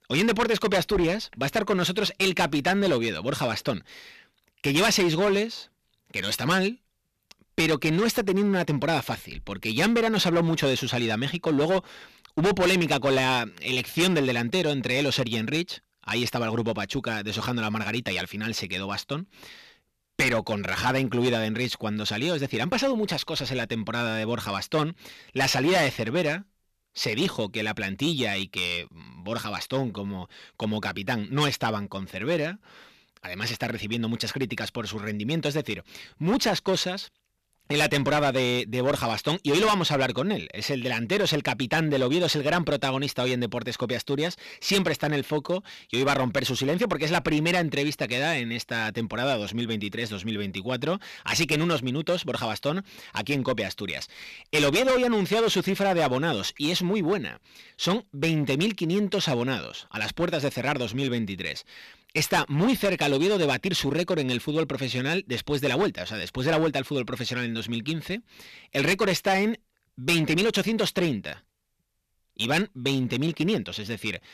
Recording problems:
distortion; heavy; 7% of the sound clipped

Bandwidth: 14.5 kHz